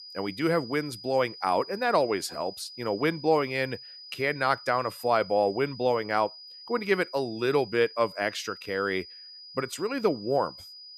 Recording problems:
high-pitched whine; noticeable; throughout; 5 kHz, 15 dB below the speech

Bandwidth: 14.5 kHz